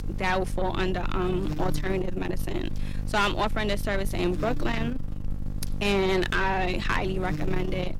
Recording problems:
distortion; slight; 15 dB below the speech
electrical hum; noticeable; throughout; 50 Hz, 10 dB below the speech

